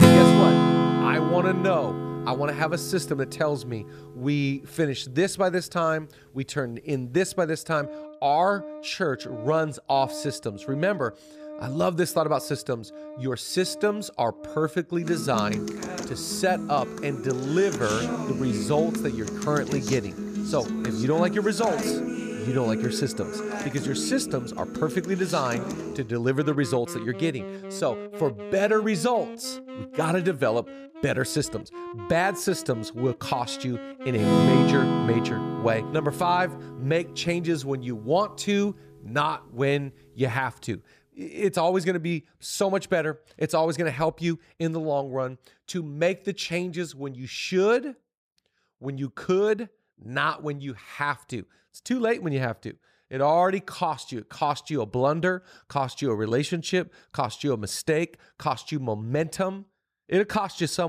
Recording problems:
background music; loud; until 41 s; 2 dB below the speech
abrupt cut into speech; at the end

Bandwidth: 14.5 kHz